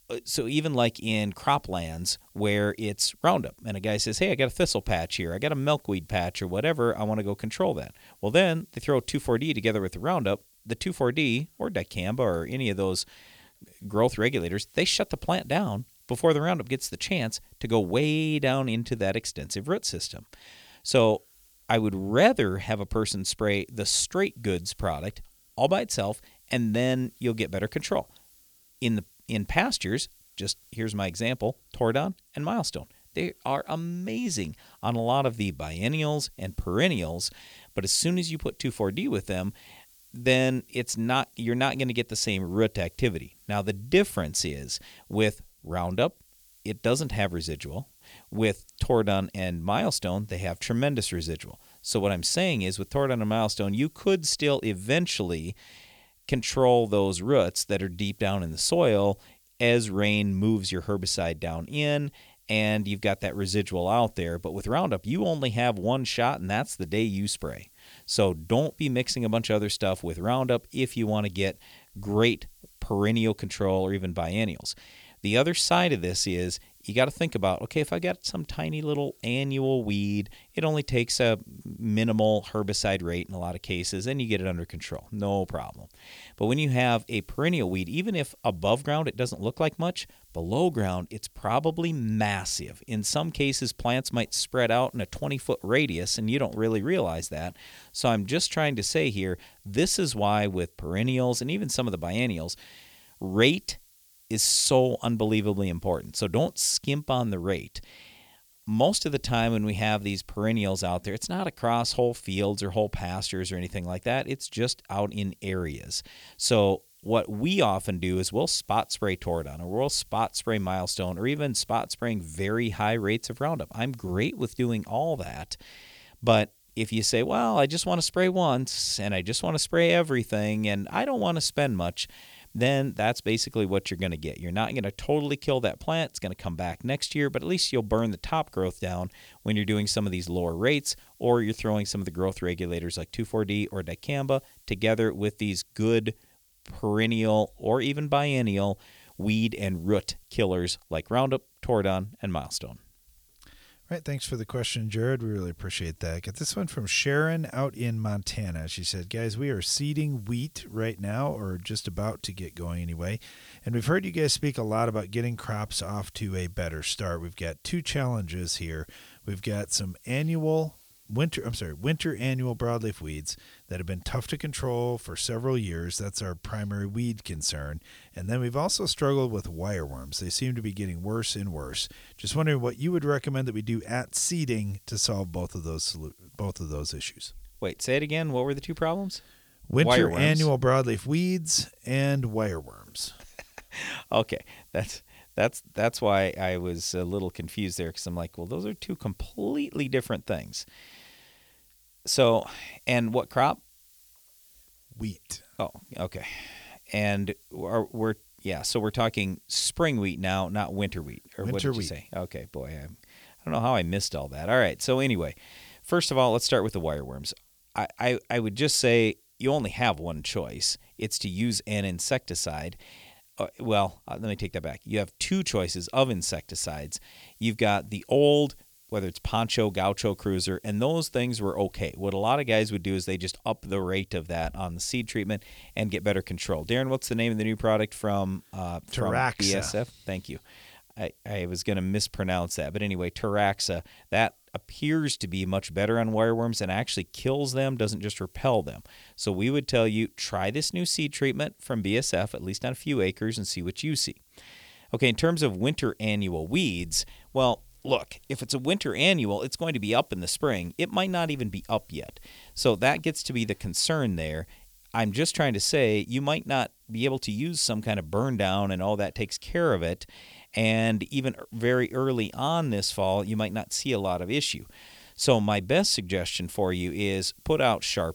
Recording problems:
hiss; faint; throughout; 30 dB below the speech

